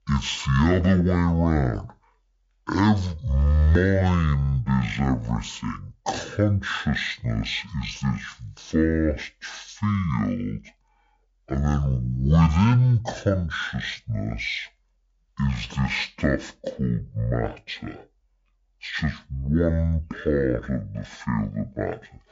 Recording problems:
wrong speed and pitch; too slow and too low; 0.5 times normal speed

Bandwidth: 7.5 kHz